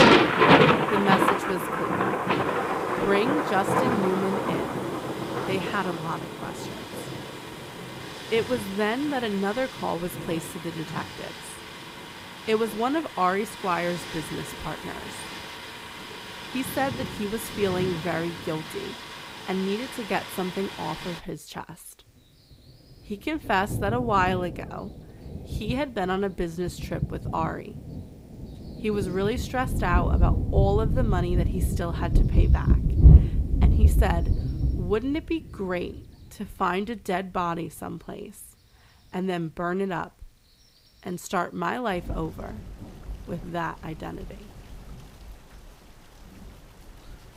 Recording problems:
rain or running water; very loud; throughout; 3 dB above the speech

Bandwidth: 15.5 kHz